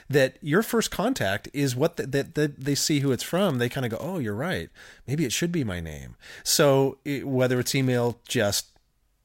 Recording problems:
crackling; faint; from 2.5 to 4 s and at 7.5 s; 25 dB below the speech

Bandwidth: 16 kHz